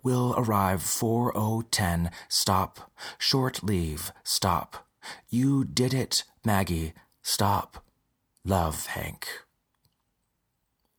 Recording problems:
none

